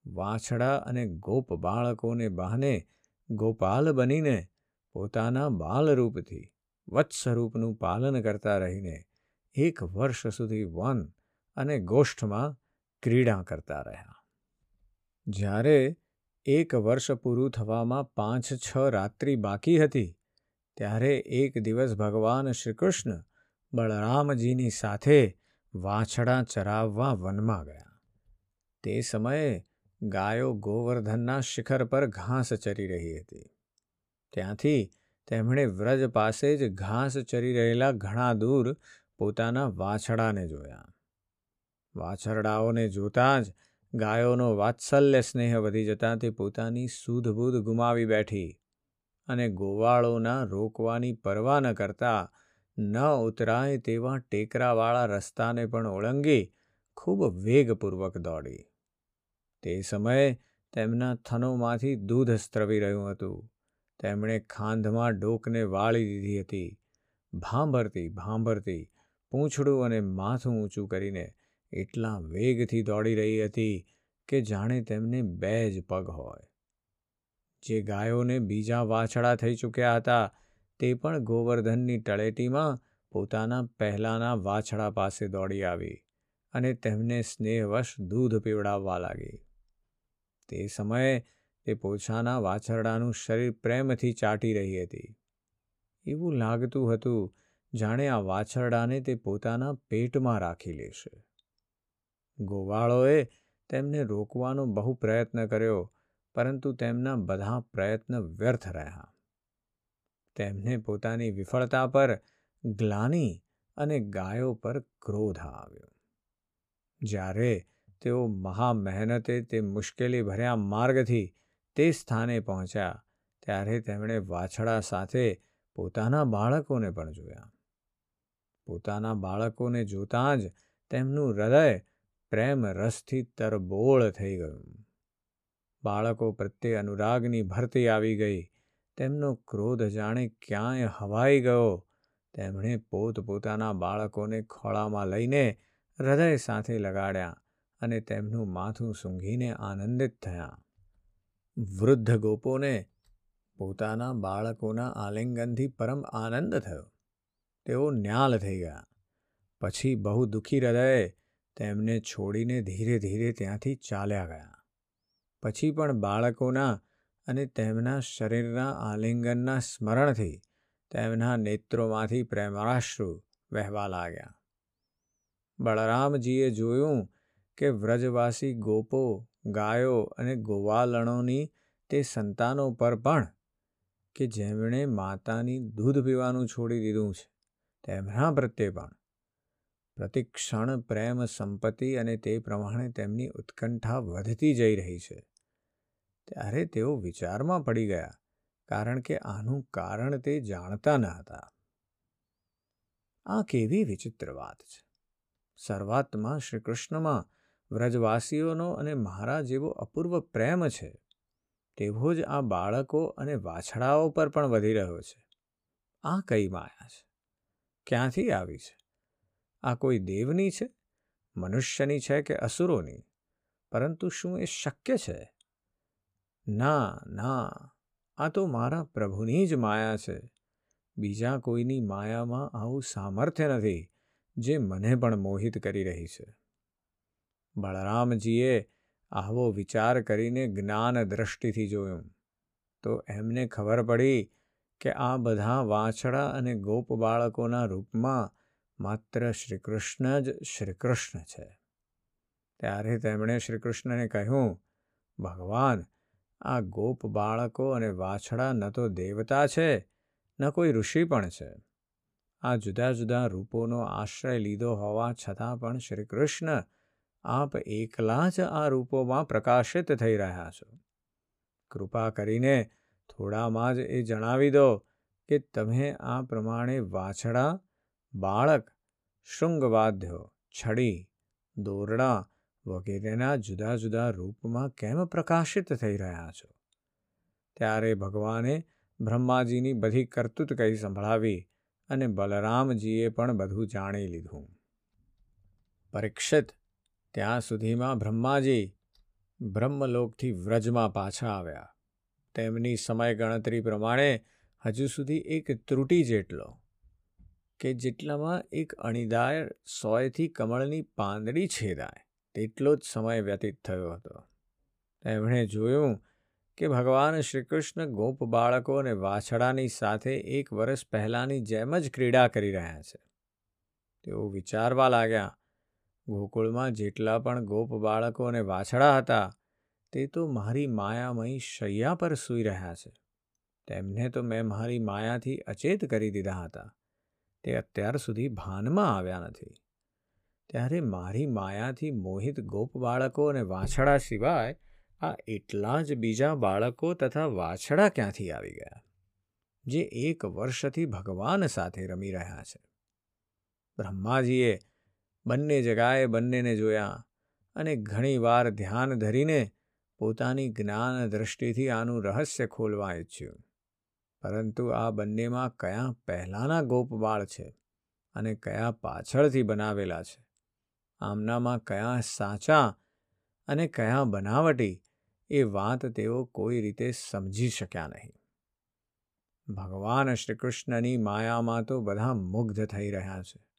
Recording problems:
none

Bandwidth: 15 kHz